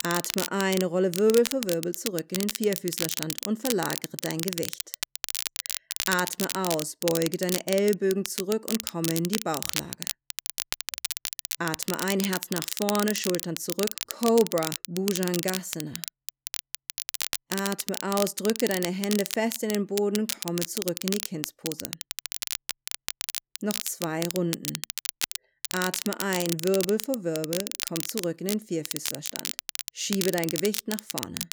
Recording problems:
crackle, like an old record; loud; 4 dB below the speech

